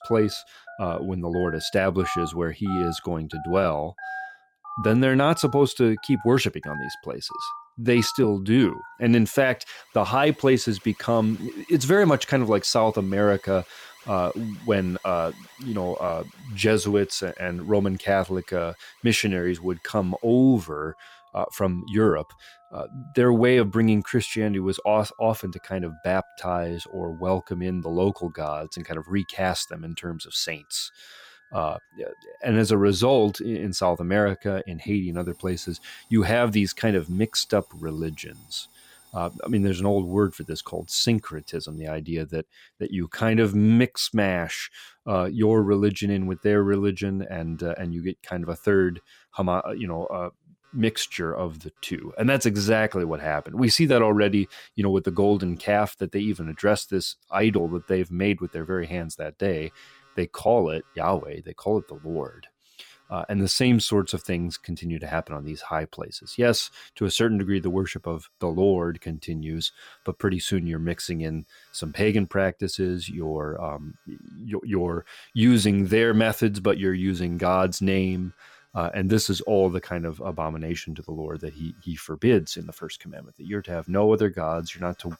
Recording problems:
alarms or sirens; noticeable; throughout; 20 dB below the speech

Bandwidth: 17 kHz